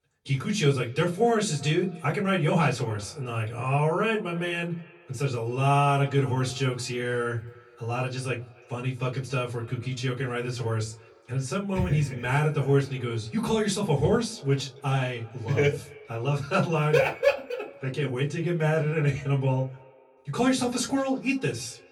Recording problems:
off-mic speech; far
echo of what is said; faint; throughout; 260 ms later, 25 dB below the speech
room echo; very slight; dies away in 0.2 s

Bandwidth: 18 kHz